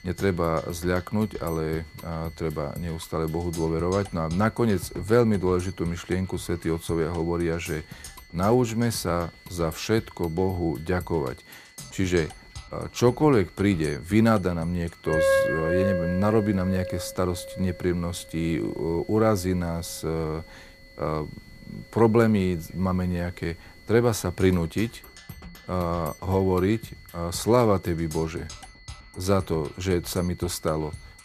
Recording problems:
background music; noticeable; throughout; 10 dB below the speech
high-pitched whine; faint; throughout; 2 kHz, 25 dB below the speech

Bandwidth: 14.5 kHz